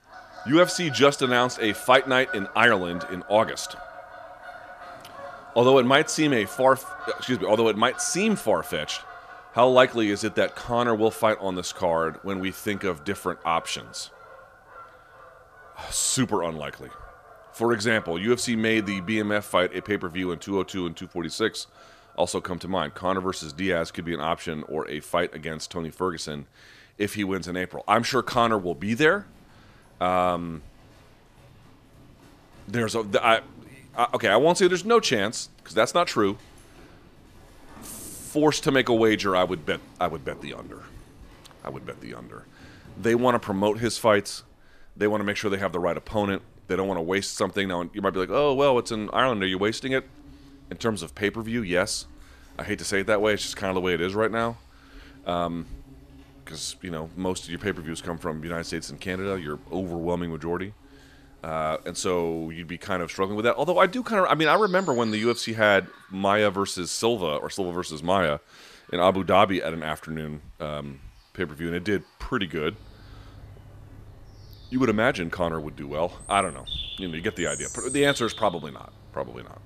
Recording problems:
animal sounds; noticeable; throughout; 20 dB below the speech

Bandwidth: 14.5 kHz